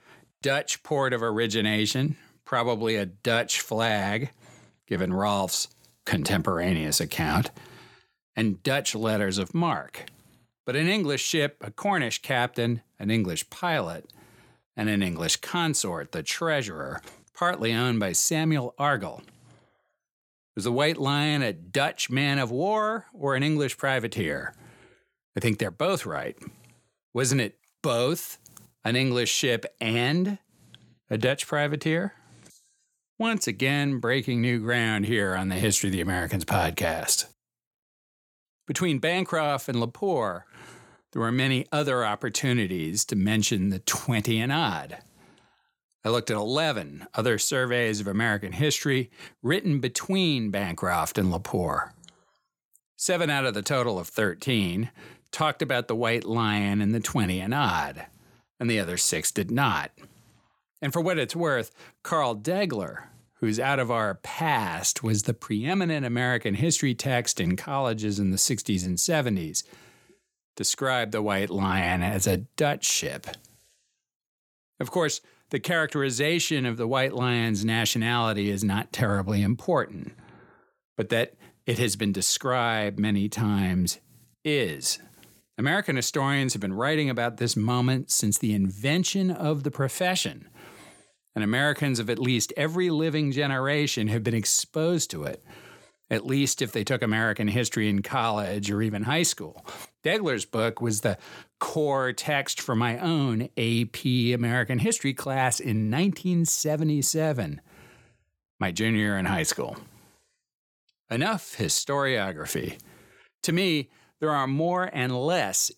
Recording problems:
none

